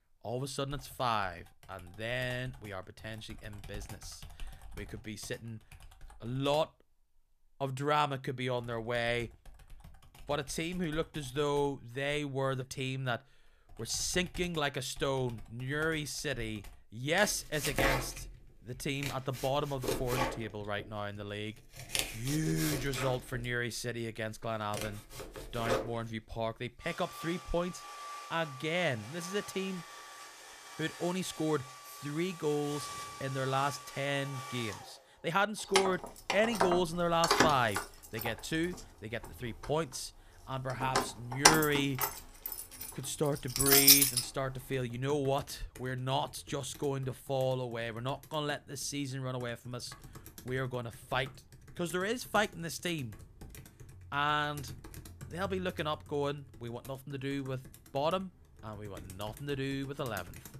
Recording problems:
household noises; very loud; throughout; 2 dB above the speech

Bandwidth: 14.5 kHz